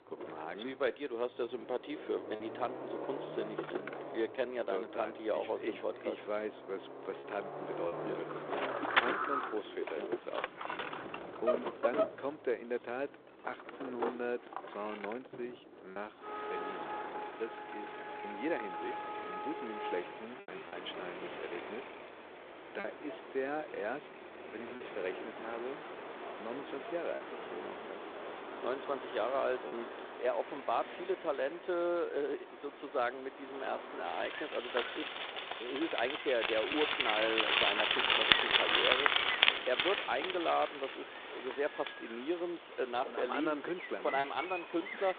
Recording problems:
phone-call audio; nothing above 3.5 kHz
traffic noise; very loud; throughout; 2 dB above the speech
choppy; occasionally; 1% of the speech affected

